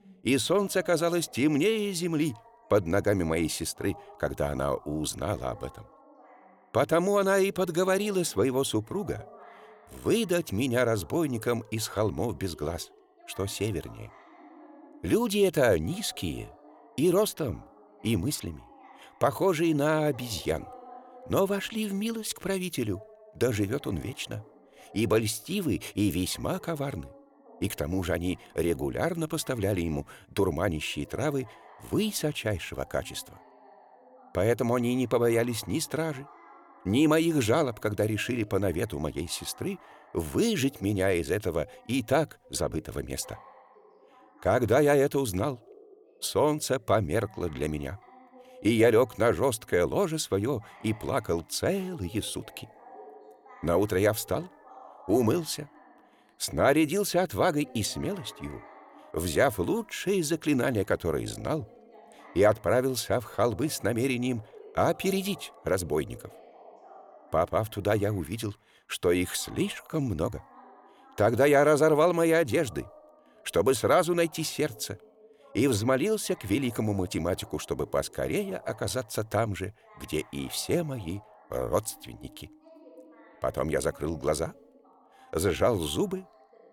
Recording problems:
voice in the background; faint; throughout; 25 dB below the speech

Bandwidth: 18.5 kHz